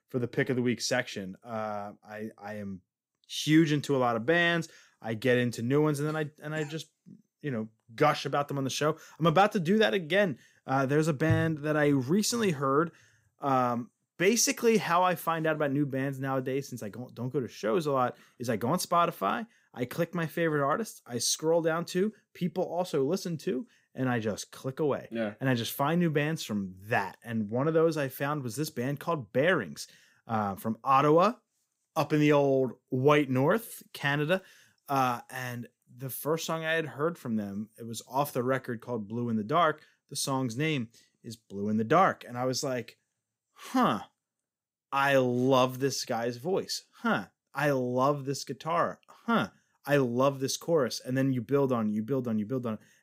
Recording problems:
none

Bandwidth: 15.5 kHz